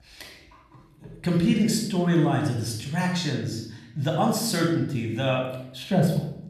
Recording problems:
room echo; noticeable; dies away in 0.7 s
off-mic speech; somewhat distant

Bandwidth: 14 kHz